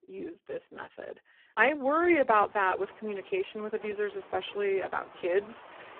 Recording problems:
phone-call audio; poor line
traffic noise; faint; throughout; 20 dB below the speech

